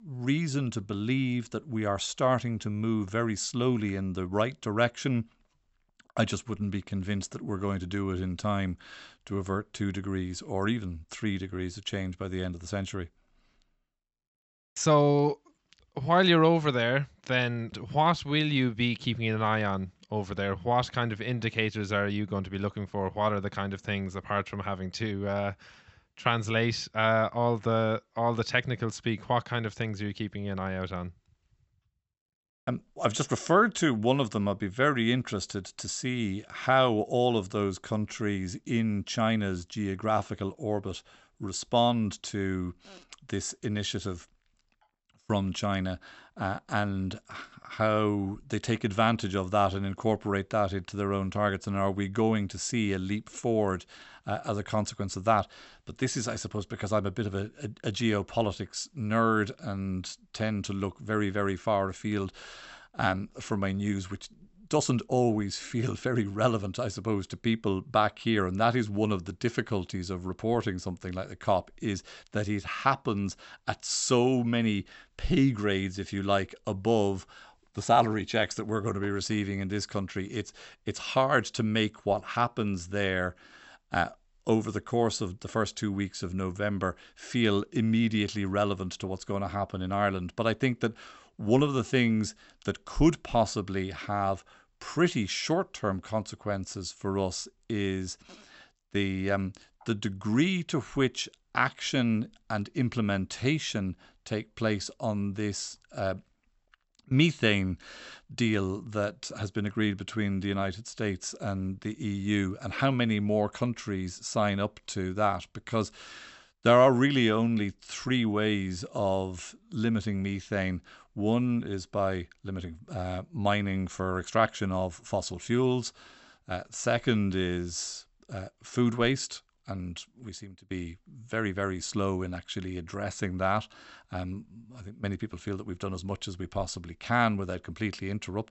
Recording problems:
high frequencies cut off; noticeable; nothing above 8 kHz

